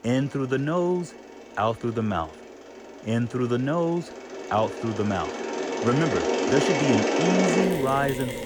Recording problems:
machinery noise; very loud; throughout; as loud as the speech

